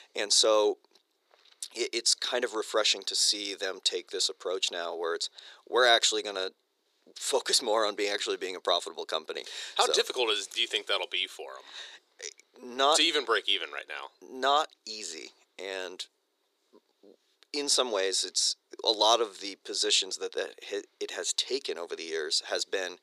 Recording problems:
thin; very; fading below 350 Hz

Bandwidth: 15 kHz